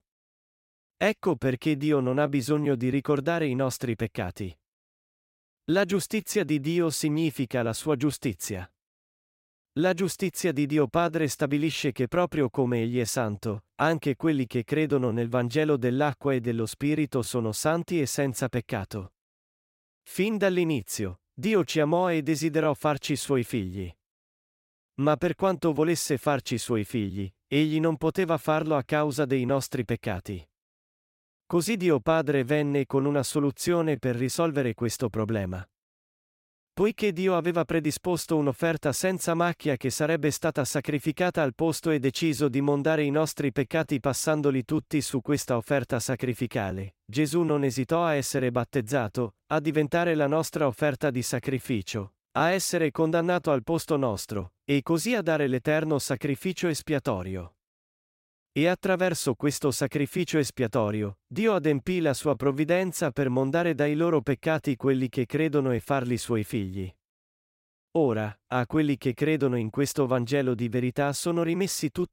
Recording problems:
none

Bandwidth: 16 kHz